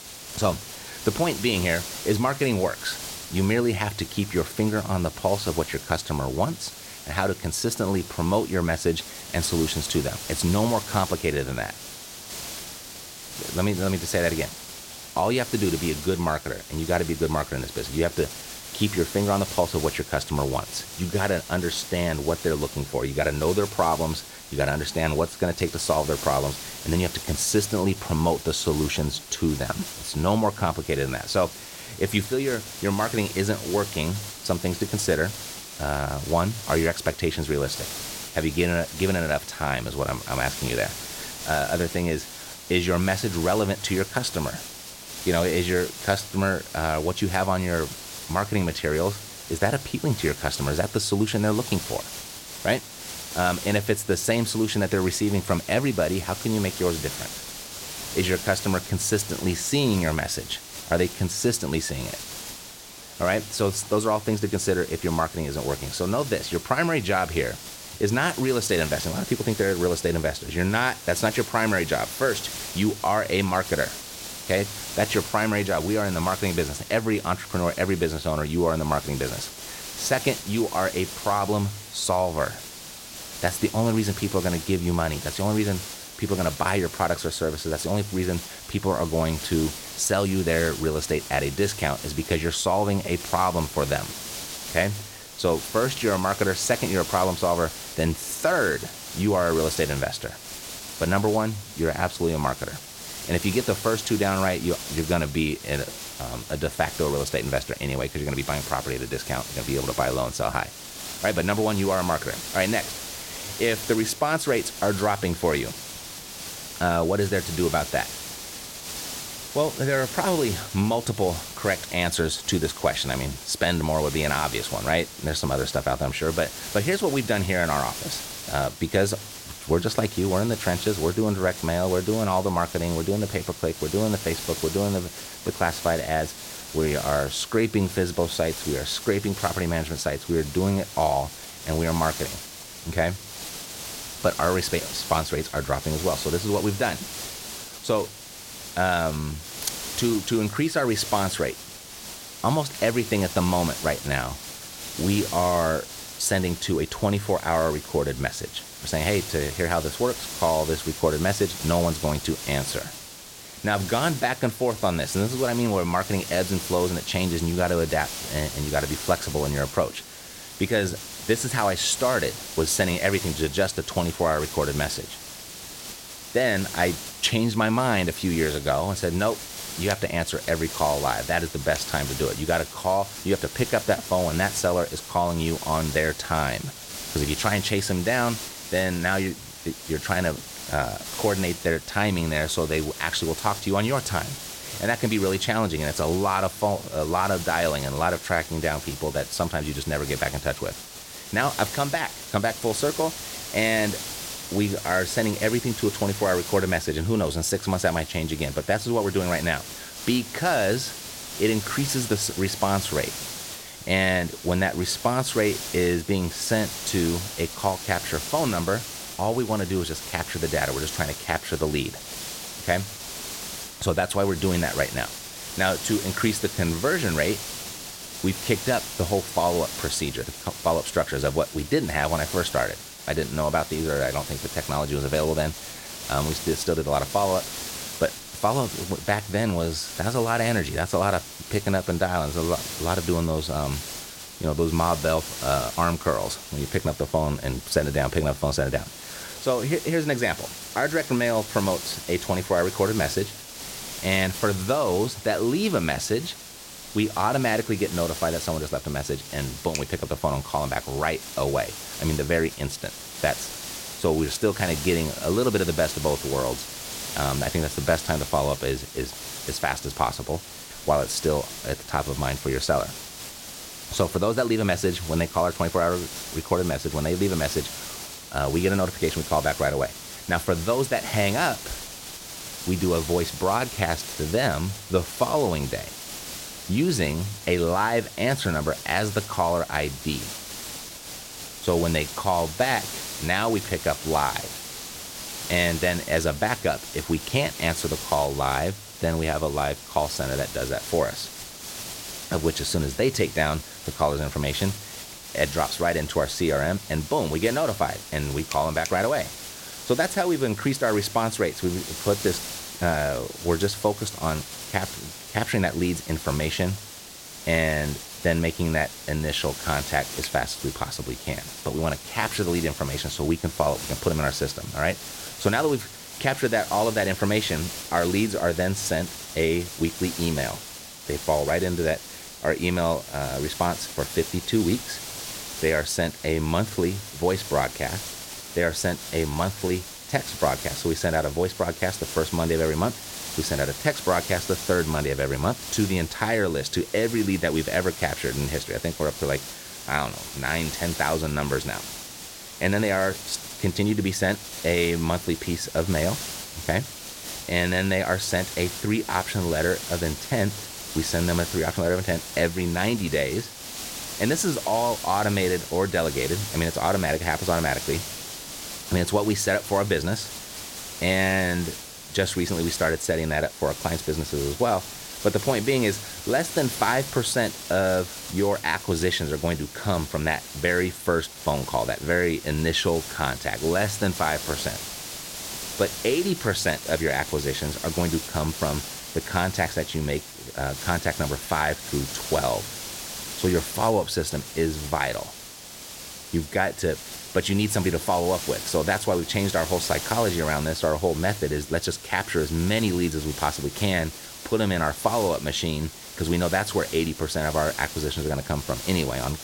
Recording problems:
hiss; loud; throughout; 9 dB below the speech

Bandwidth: 16.5 kHz